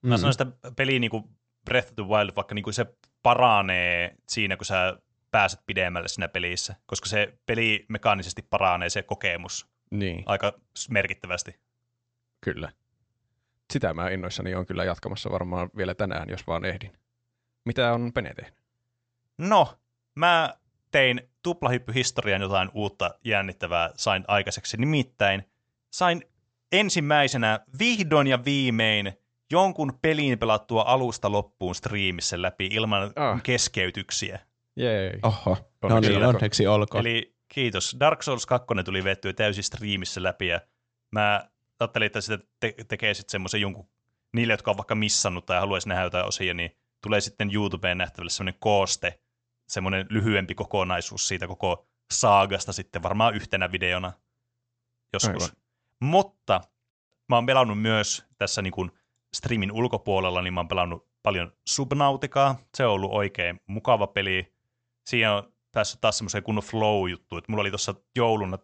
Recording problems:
high frequencies cut off; noticeable; nothing above 8 kHz

